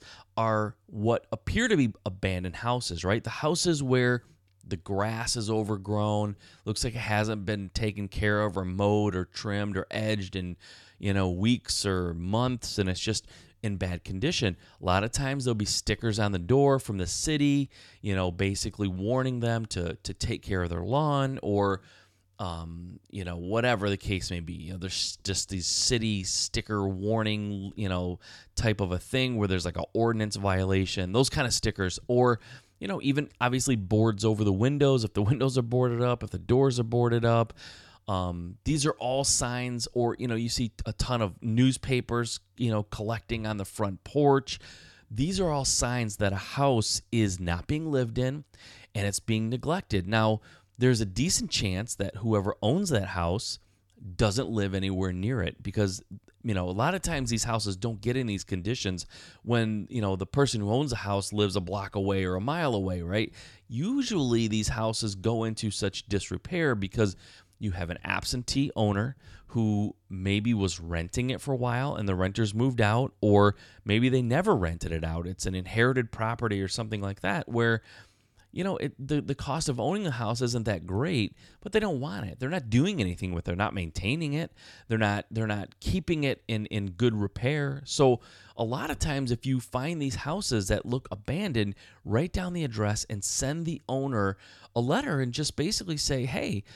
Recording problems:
none

